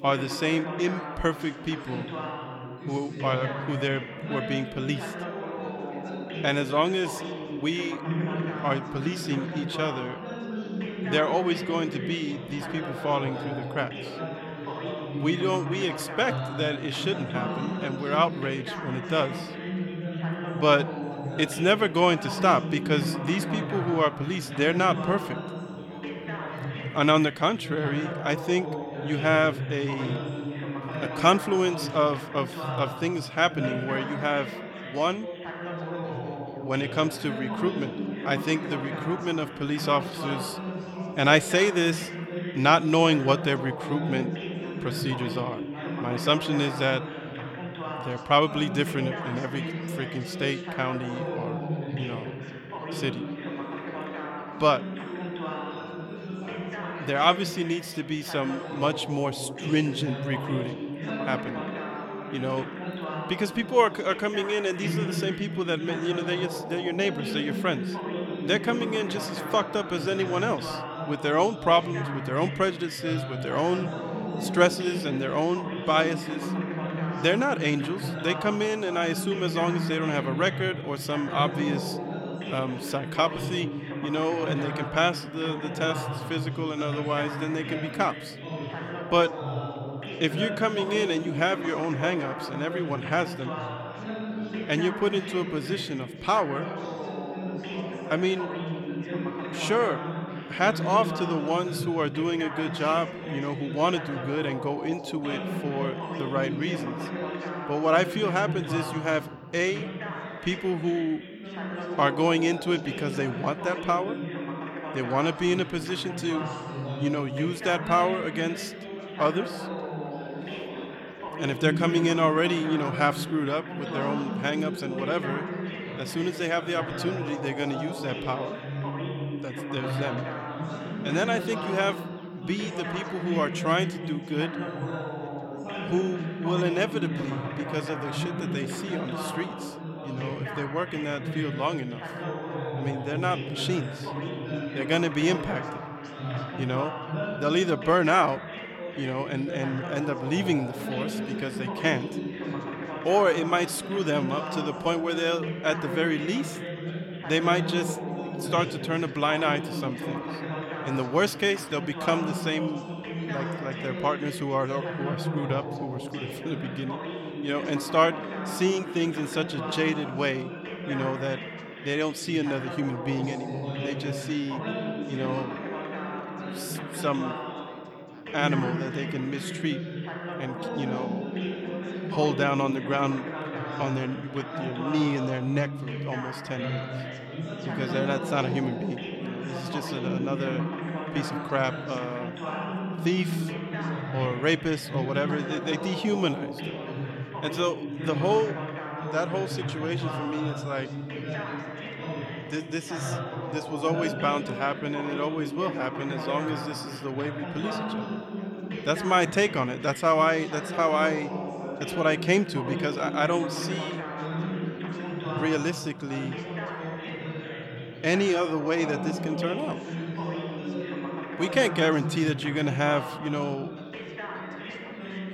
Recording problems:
background chatter; loud; throughout; 3 voices, 6 dB below the speech

